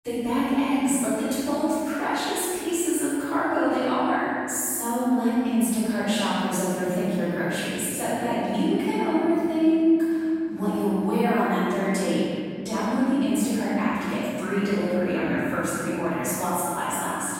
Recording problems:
room echo; strong; dies away in 3 s
off-mic speech; far

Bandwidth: 16 kHz